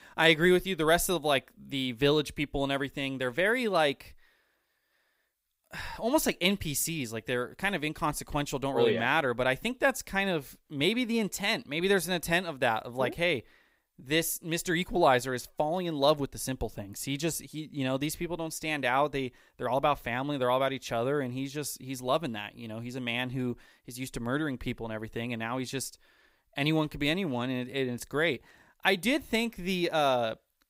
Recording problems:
none

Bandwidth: 15.5 kHz